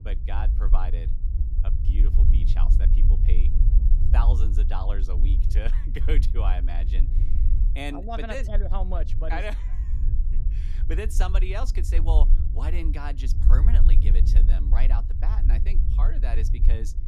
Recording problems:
low rumble; loud; throughout; 8 dB below the speech

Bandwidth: 14 kHz